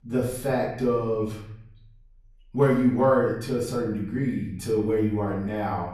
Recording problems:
off-mic speech; far
room echo; noticeable; dies away in 0.8 s

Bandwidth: 13.5 kHz